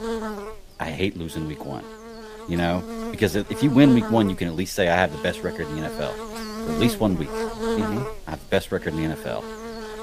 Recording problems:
electrical hum; loud; throughout; 60 Hz, 7 dB below the speech

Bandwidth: 15 kHz